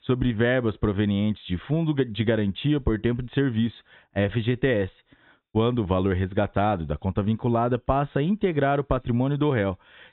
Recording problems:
high frequencies cut off; severe; nothing above 4 kHz
hiss; very faint; throughout; 50 dB below the speech

